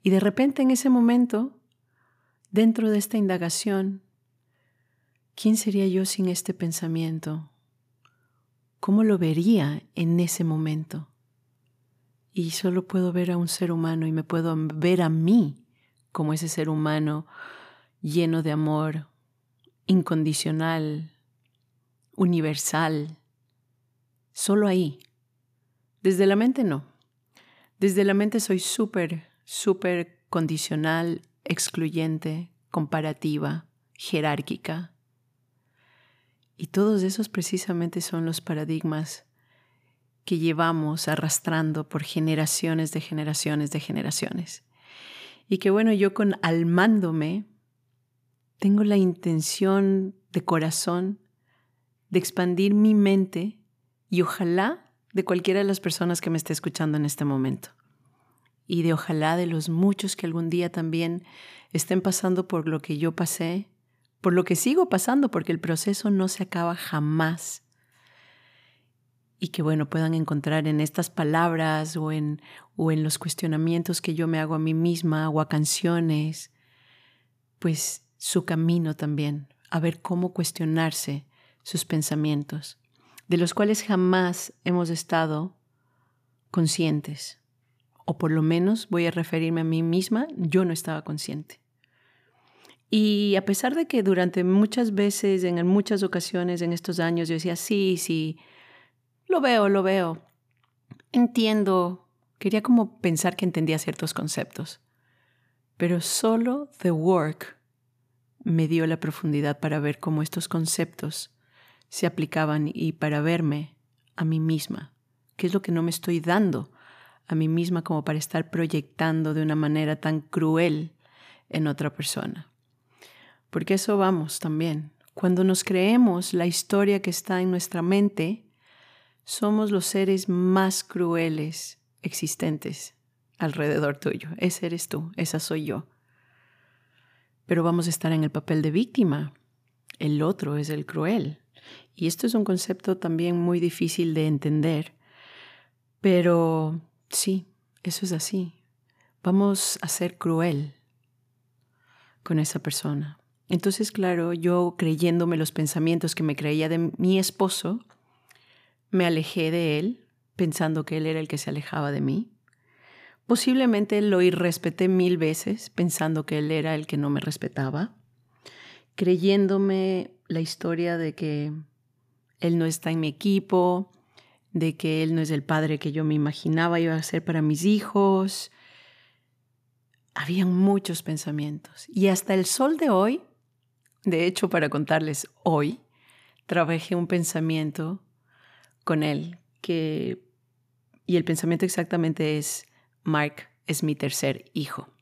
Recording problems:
none

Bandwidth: 15 kHz